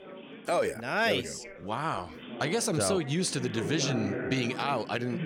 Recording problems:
background chatter; loud; throughout; 3 voices, 9 dB below the speech

